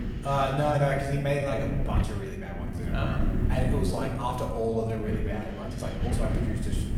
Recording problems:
off-mic speech; far
room echo; noticeable; dies away in 1.1 s
wind noise on the microphone; occasional gusts; 10 dB below the speech
uneven, jittery; strongly; from 0.5 to 6.5 s

